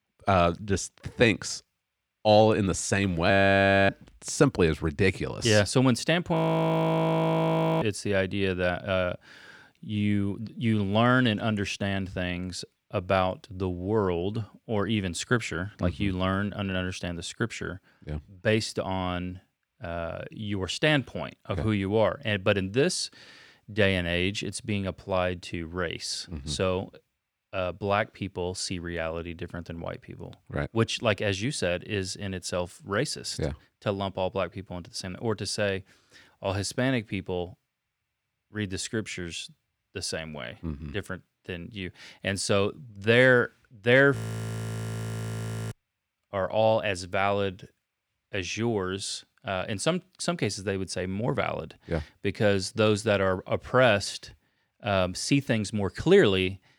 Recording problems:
audio freezing; at 3.5 s for 0.5 s, at 6.5 s for 1.5 s and at 44 s for 1.5 s

